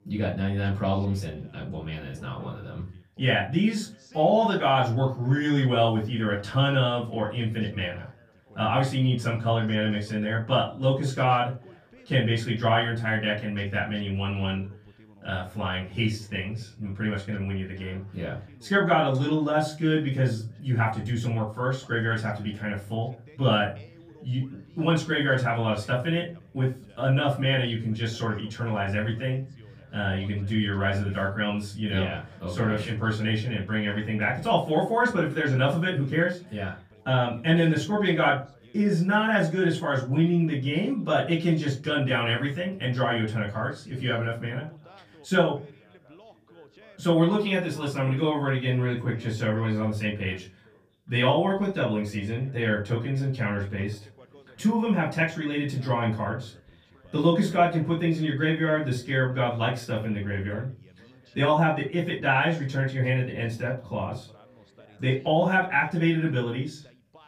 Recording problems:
off-mic speech; far
room echo; slight; dies away in 0.3 s
background chatter; faint; throughout; 2 voices, 30 dB below the speech

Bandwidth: 15 kHz